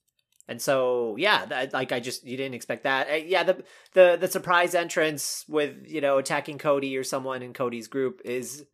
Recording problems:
none

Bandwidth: 14.5 kHz